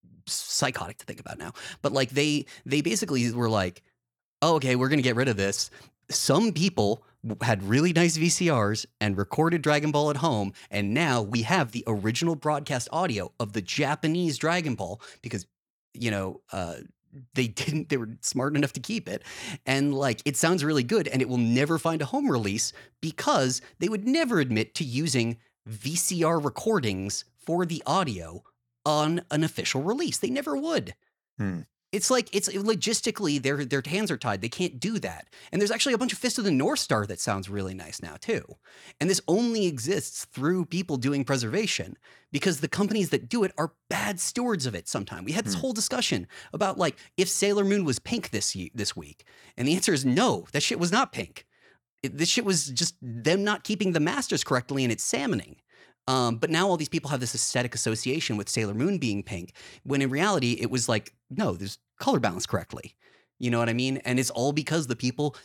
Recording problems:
none

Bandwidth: 18.5 kHz